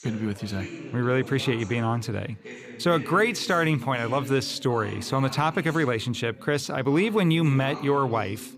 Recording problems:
background chatter; noticeable; throughout; 2 voices, 15 dB below the speech

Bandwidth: 14.5 kHz